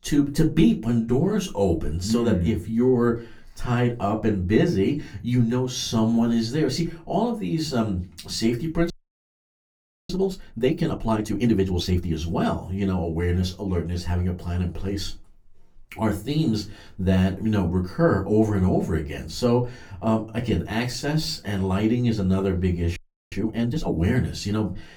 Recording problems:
off-mic speech; far
room echo; very slight; dies away in 0.2 s
audio freezing; at 9 s for 1 s and at 23 s

